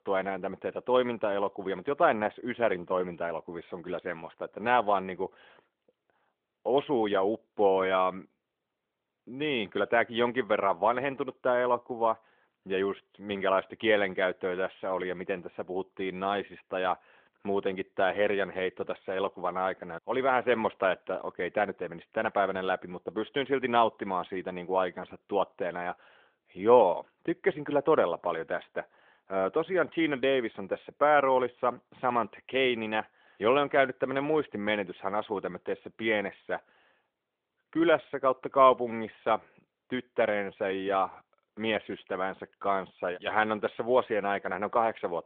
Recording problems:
phone-call audio; nothing above 3.5 kHz

